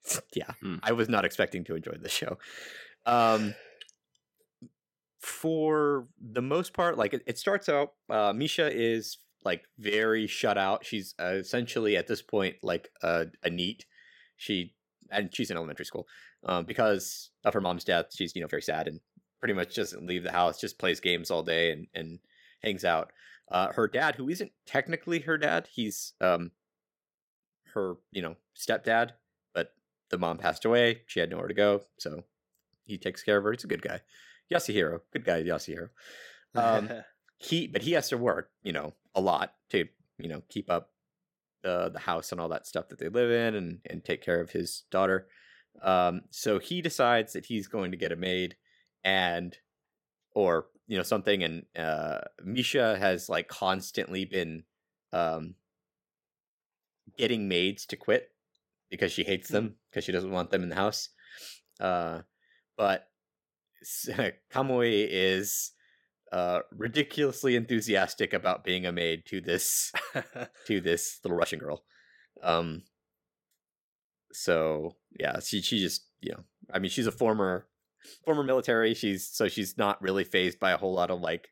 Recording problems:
uneven, jittery; strongly; from 5 s to 1:19

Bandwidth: 16.5 kHz